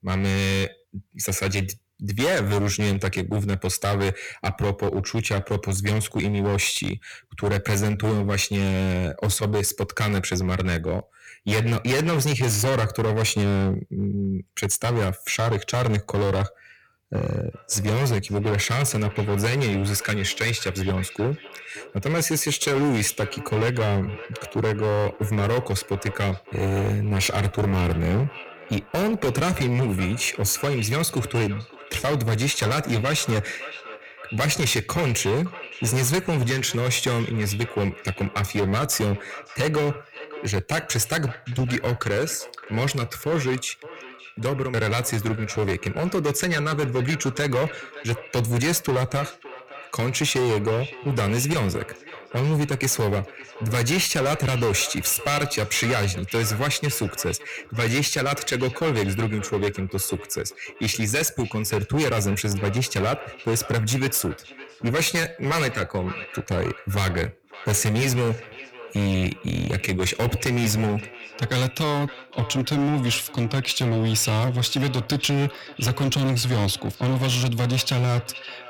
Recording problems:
distortion; heavy; 16% of the sound clipped
echo of what is said; noticeable; from 18 s on; 560 ms later, 15 dB below the speech

